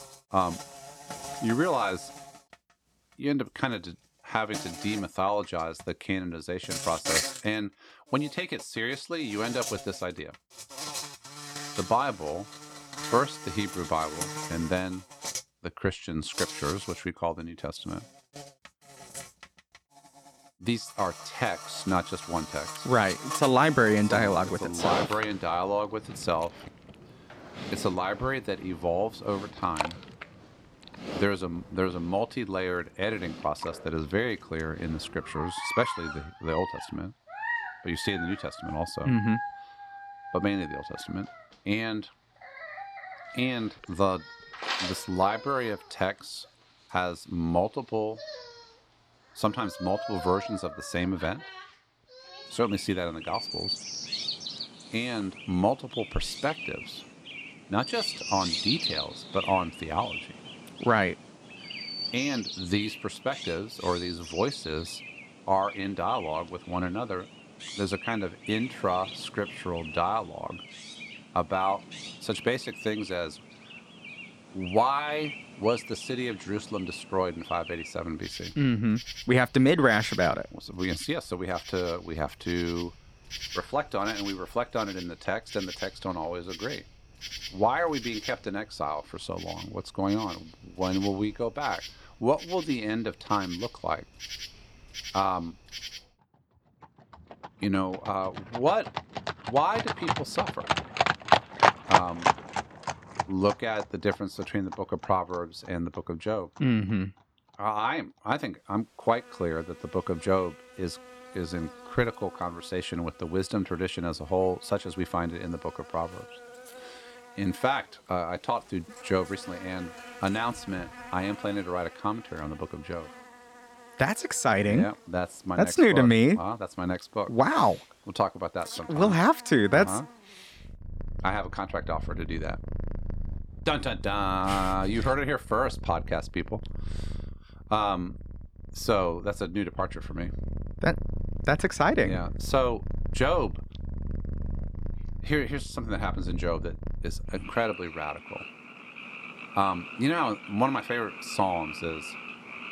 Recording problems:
animal sounds; loud; throughout; 7 dB below the speech

